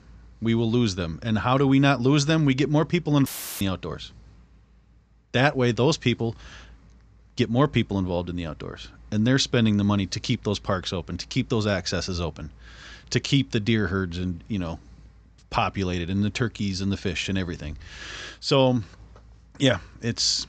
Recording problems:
high frequencies cut off; noticeable; nothing above 8 kHz
audio cutting out; filled with static; at 3.5 s

